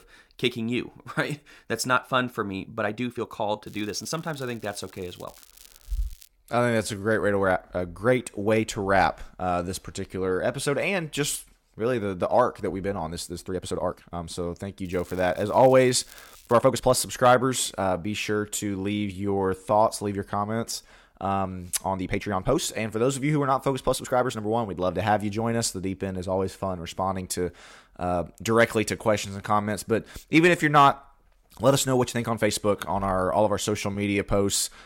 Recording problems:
crackling; faint; from 3.5 to 6.5 s and from 15 to 17 s; 25 dB below the speech
uneven, jittery; strongly; from 1.5 to 34 s

